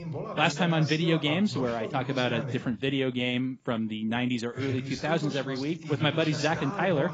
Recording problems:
garbled, watery; badly; nothing above 7.5 kHz
voice in the background; loud; throughout; 8 dB below the speech

